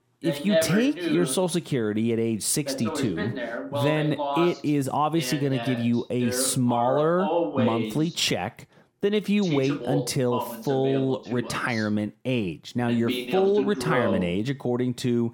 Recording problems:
voice in the background; loud; throughout; 5 dB below the speech

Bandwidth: 17.5 kHz